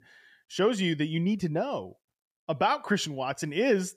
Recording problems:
none

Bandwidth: 15 kHz